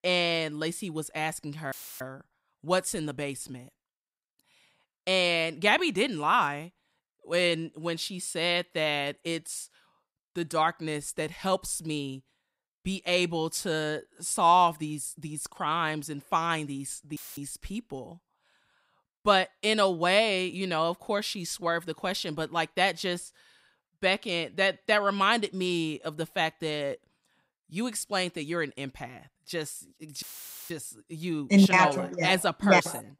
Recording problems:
audio cutting out; filled with static; at 1.5 s, at 17 s and at 30 s

